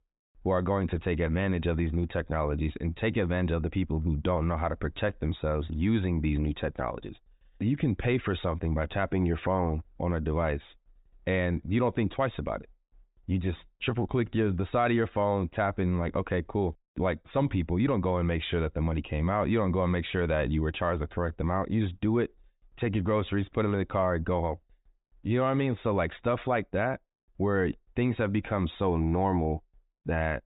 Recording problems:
high frequencies cut off; severe; nothing above 4 kHz

